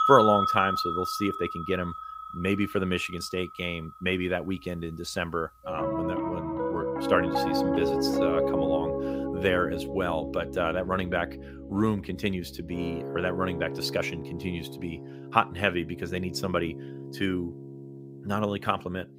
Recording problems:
background music; loud; throughout; 2 dB below the speech

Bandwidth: 15.5 kHz